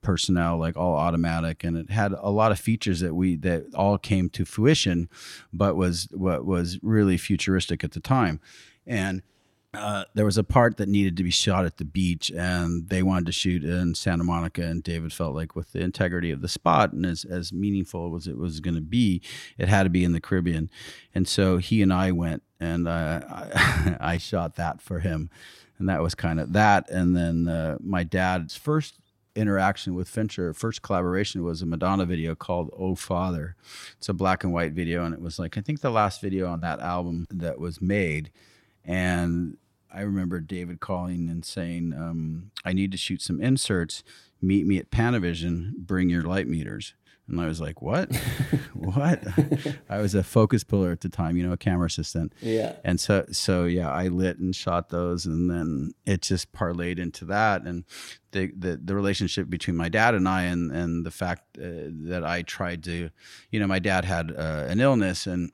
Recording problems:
none

